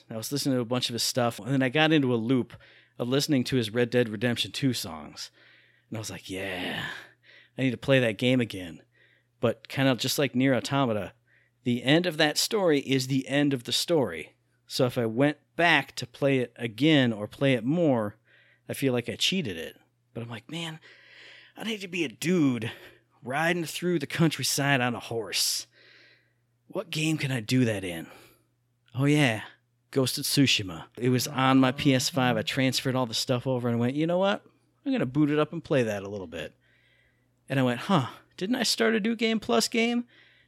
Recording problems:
none

